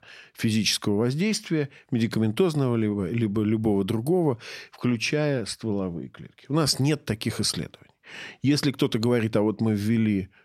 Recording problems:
none

